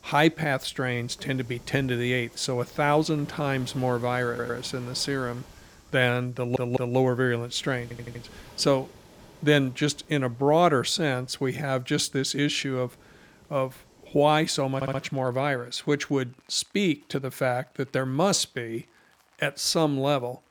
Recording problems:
rain or running water; faint; throughout; 25 dB below the speech
audio stuttering; 4 times, first at 4.5 s

